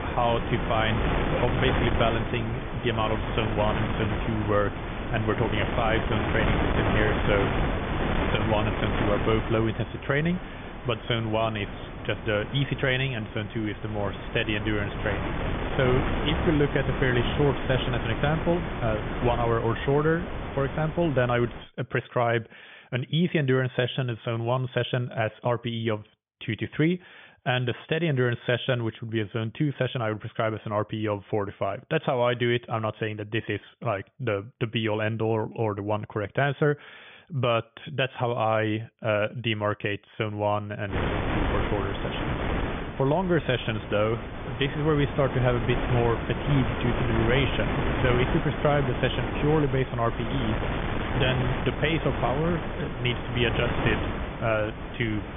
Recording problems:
high frequencies cut off; severe; nothing above 3.5 kHz
wind noise on the microphone; heavy; until 22 s and from 41 s on; 4 dB below the speech

